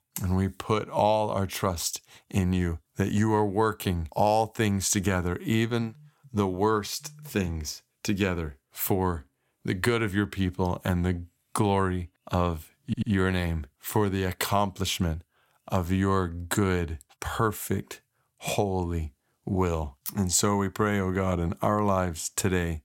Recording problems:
audio stuttering; at 13 s

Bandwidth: 16.5 kHz